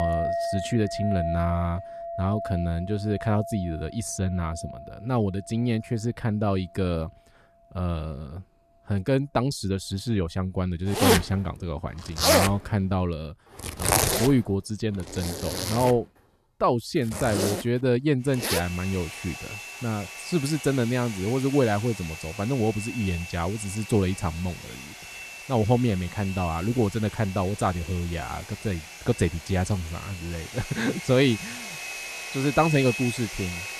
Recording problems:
household noises; loud; throughout; 4 dB below the speech
abrupt cut into speech; at the start

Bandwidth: 14 kHz